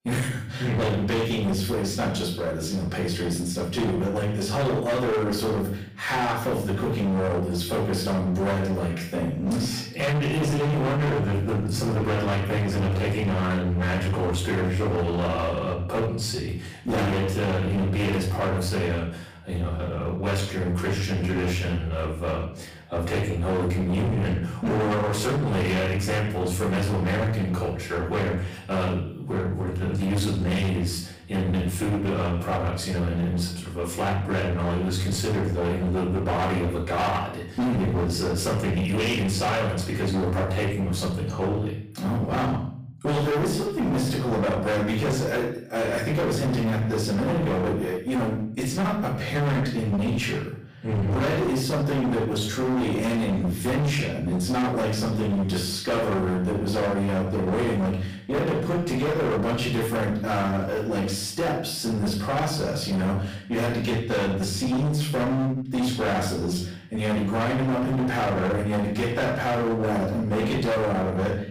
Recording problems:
distortion; heavy; 33% of the sound clipped
off-mic speech; far
room echo; noticeable; dies away in 0.5 s

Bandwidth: 15.5 kHz